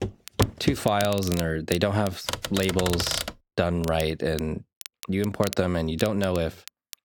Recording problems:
crackle, like an old record; noticeable; 15 dB below the speech
footsteps; noticeable; at the start; peak 1 dB below the speech
keyboard typing; noticeable; from 2.5 to 3.5 s; peak 2 dB below the speech

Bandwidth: 17.5 kHz